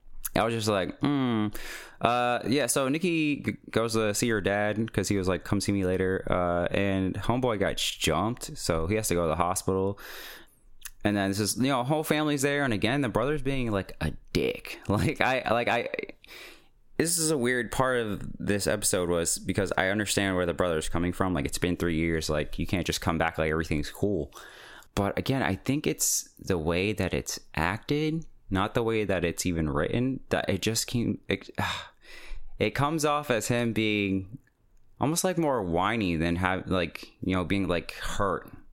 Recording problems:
squashed, flat; heavily

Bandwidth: 16.5 kHz